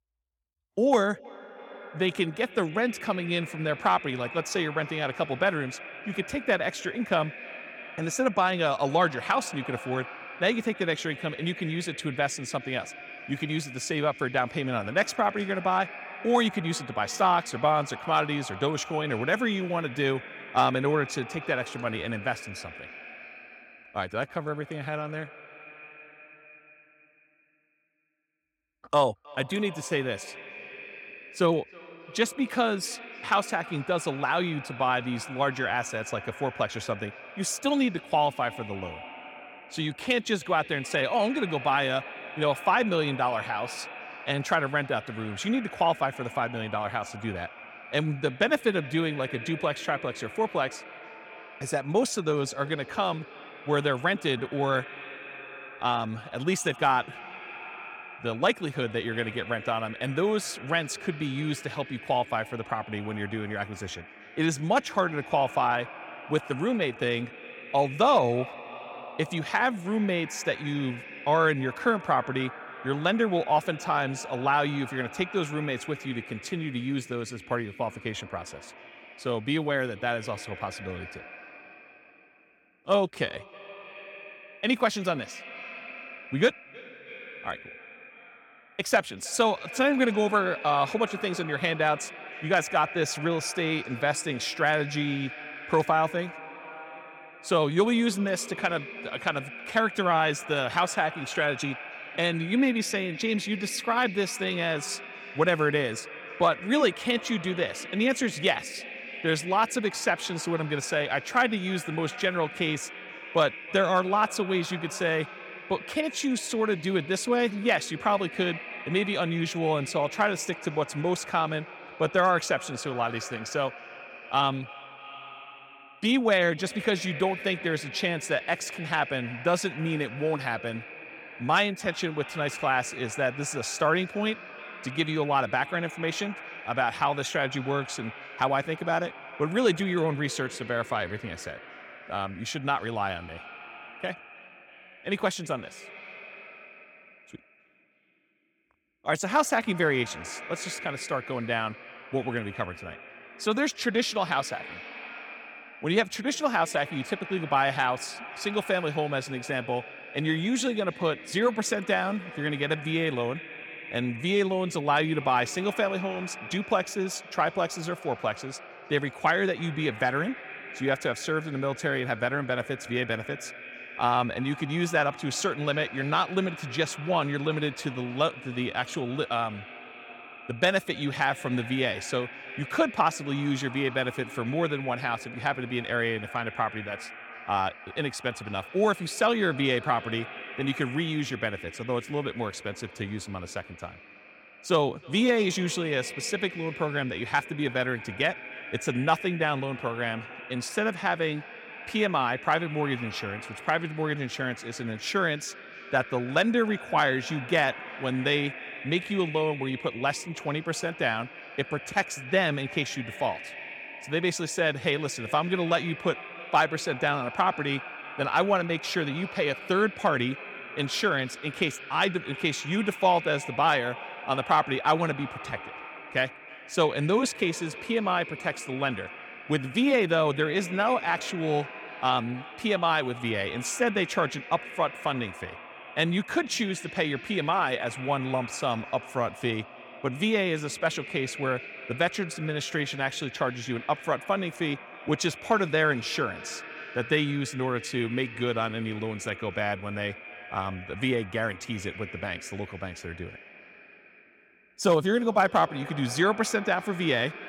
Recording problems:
echo of what is said; noticeable; throughout; 320 ms later, 15 dB below the speech

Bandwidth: 18 kHz